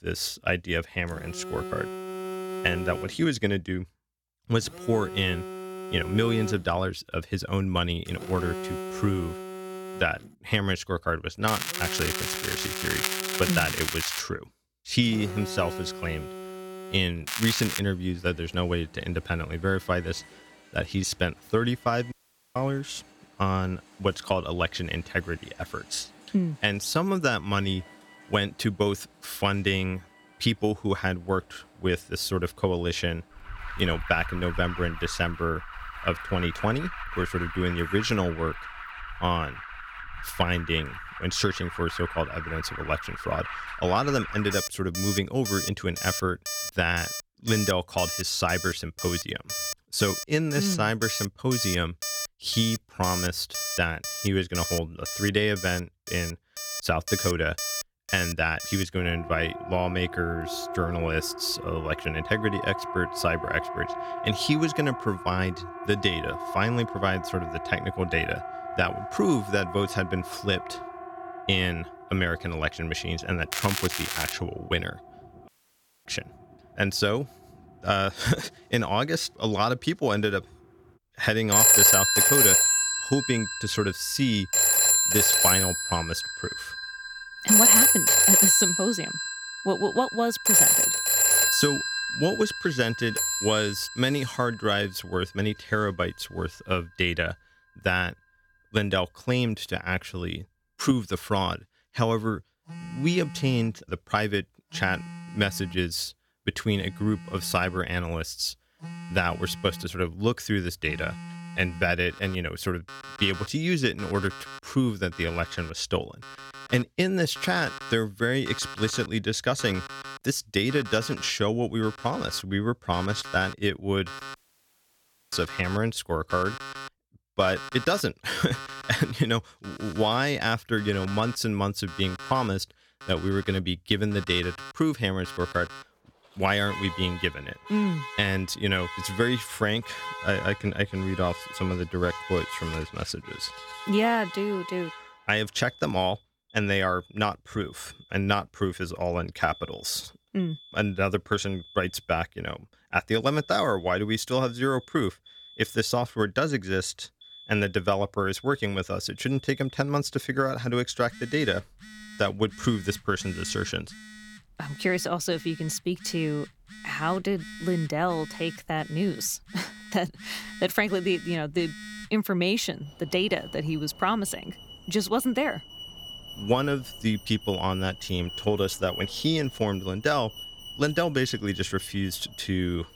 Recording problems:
alarms or sirens; very loud; throughout; 1 dB above the speech
crackling; loud; from 11 to 14 s, at 17 s and at 1:14; 2 dB below the speech
audio cutting out; at 22 s, at 1:15 for 0.5 s and at 2:04 for 1 s

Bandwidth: 18 kHz